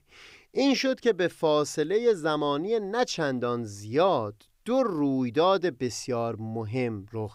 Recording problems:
none

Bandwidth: 15.5 kHz